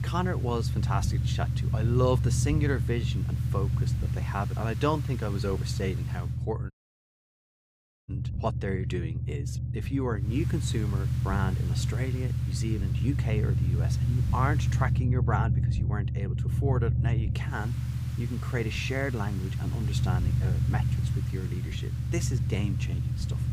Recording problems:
low rumble; loud; throughout; 7 dB below the speech
hiss; noticeable; until 6.5 s, from 10 to 15 s and from 17 s on; 15 dB below the speech
audio cutting out; at 6.5 s for 1.5 s

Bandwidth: 15.5 kHz